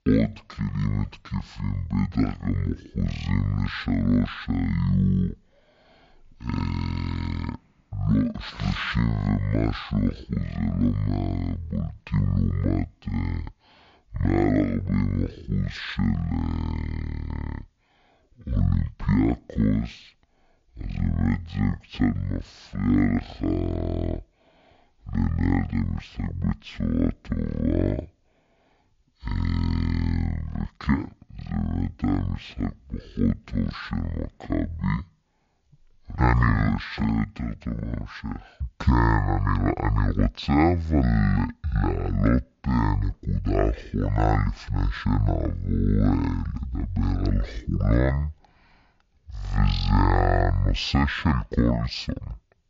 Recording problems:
wrong speed and pitch; too slow and too low; 0.5 times normal speed

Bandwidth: 7.5 kHz